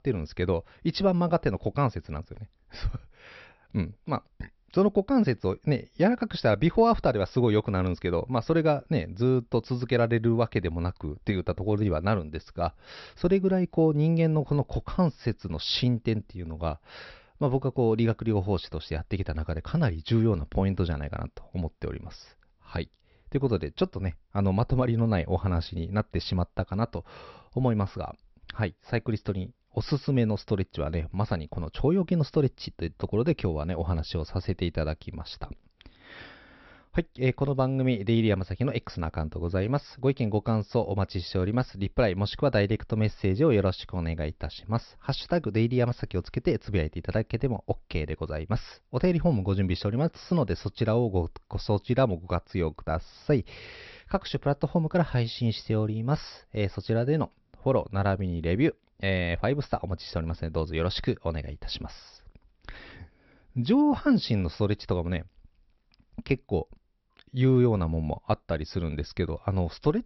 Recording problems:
high frequencies cut off; noticeable; nothing above 5.5 kHz

